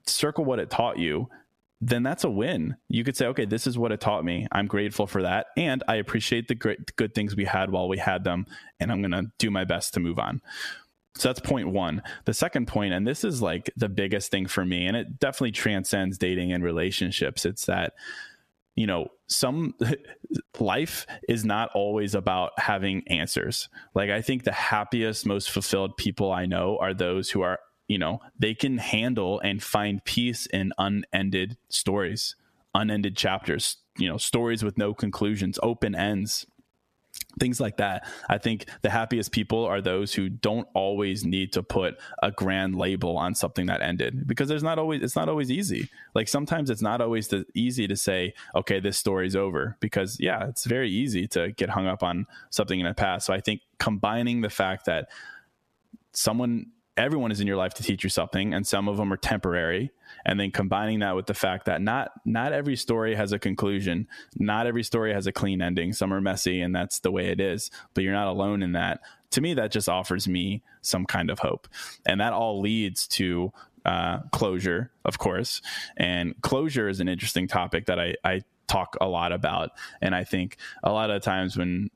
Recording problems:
squashed, flat; heavily

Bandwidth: 14.5 kHz